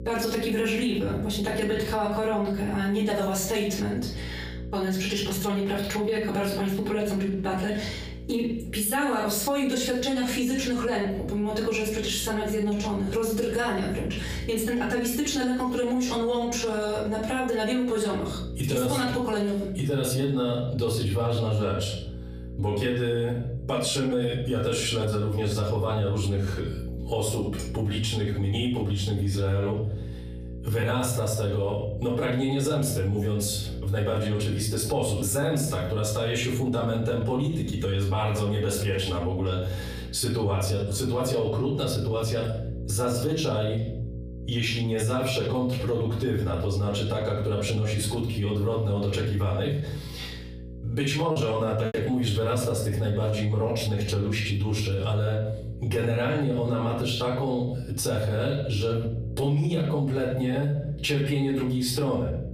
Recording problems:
off-mic speech; far
room echo; slight; dies away in 0.4 s
squashed, flat; somewhat
electrical hum; faint; throughout; 60 Hz, 25 dB below the speech
choppy; occasionally; at 51 s; 2% of the speech affected

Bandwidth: 15 kHz